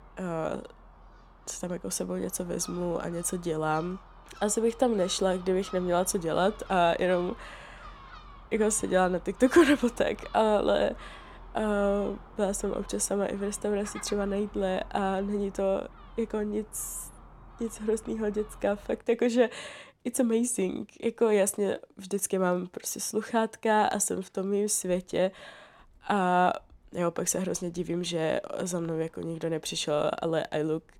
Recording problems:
animal sounds; faint; throughout; 20 dB below the speech

